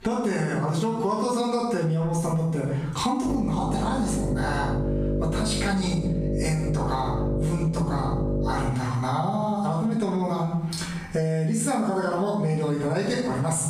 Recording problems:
off-mic speech; far
room echo; noticeable; dies away in 0.6 s
squashed, flat; somewhat
electrical hum; loud; from 3.5 to 8.5 s; 50 Hz, 6 dB below the speech

